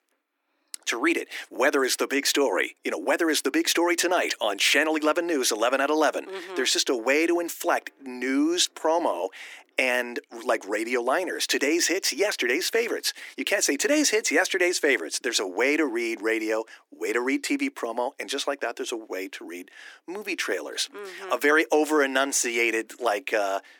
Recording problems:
thin; somewhat; fading below 300 Hz

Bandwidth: 18.5 kHz